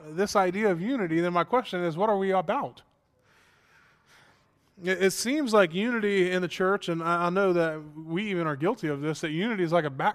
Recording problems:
none

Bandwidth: 14.5 kHz